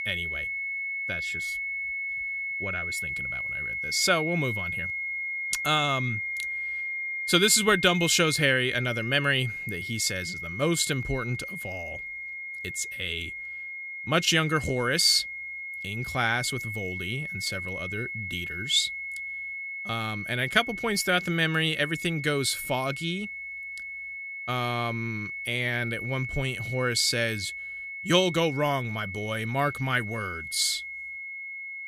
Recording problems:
high-pitched whine; loud; throughout; 2 kHz, 6 dB below the speech

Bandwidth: 14.5 kHz